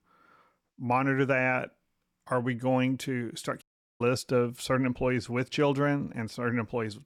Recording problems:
audio cutting out; at 3.5 s

